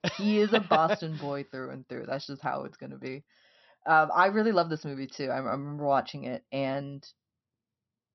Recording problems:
high frequencies cut off; noticeable; nothing above 6 kHz

